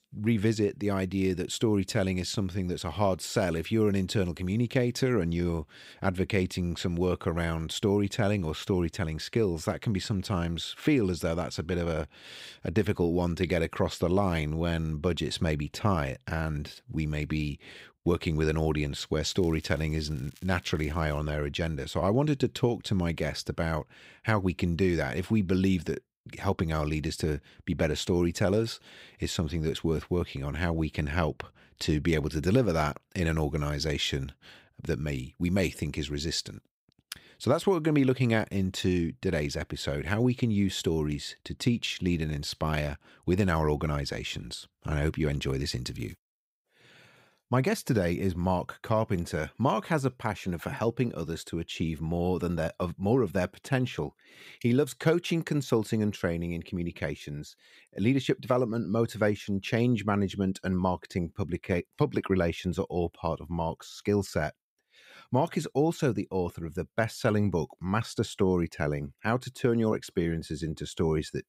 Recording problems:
crackling; faint; from 19 to 21 s; 25 dB below the speech

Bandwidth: 15.5 kHz